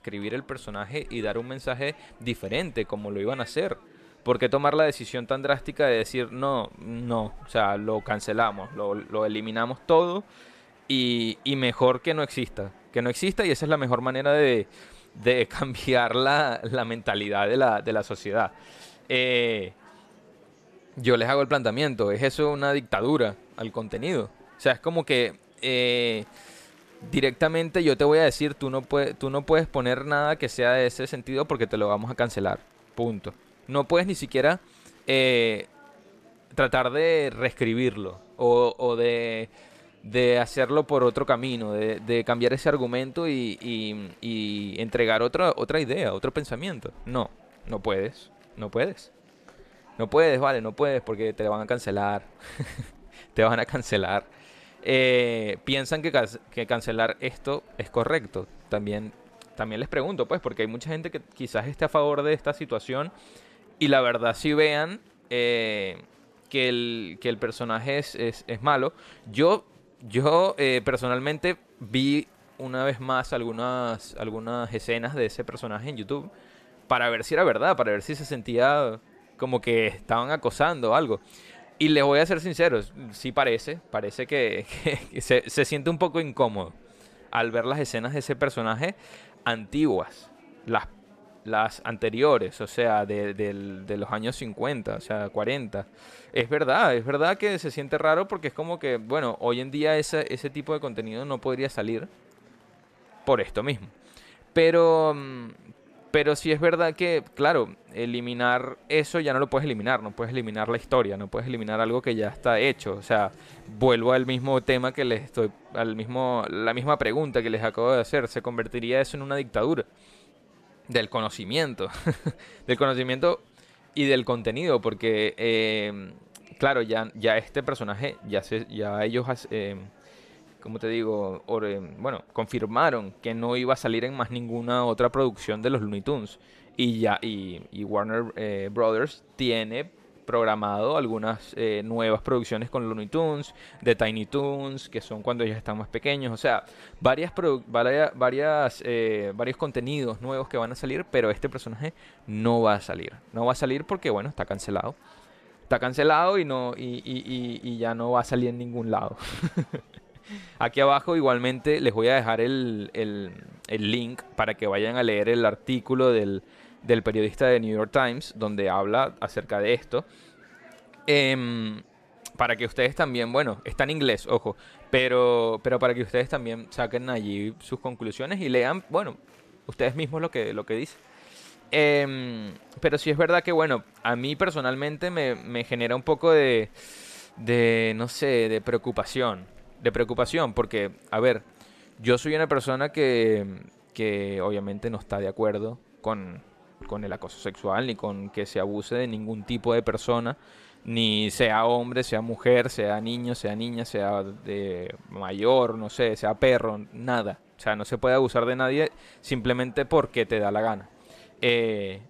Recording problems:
murmuring crowd; faint; throughout; 30 dB below the speech

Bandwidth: 14 kHz